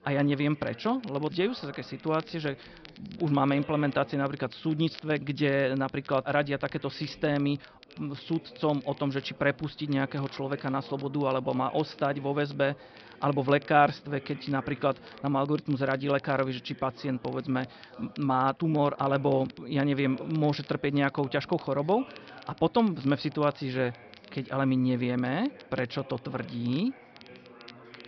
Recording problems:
high frequencies cut off; noticeable; nothing above 5.5 kHz
background chatter; faint; throughout; 4 voices, 20 dB below the speech
crackle, like an old record; faint; 25 dB below the speech

